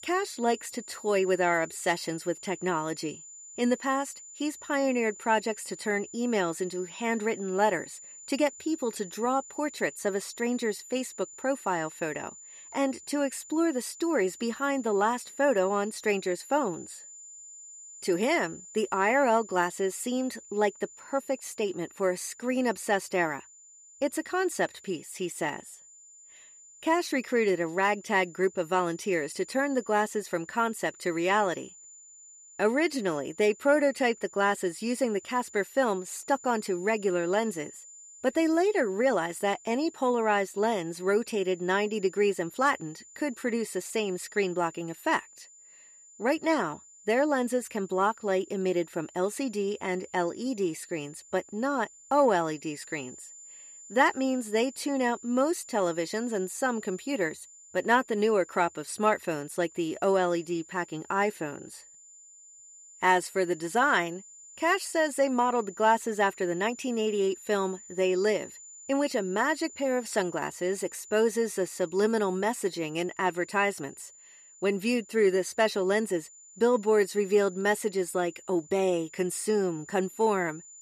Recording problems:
high-pitched whine; noticeable; throughout; 7 kHz, 20 dB below the speech

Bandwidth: 14.5 kHz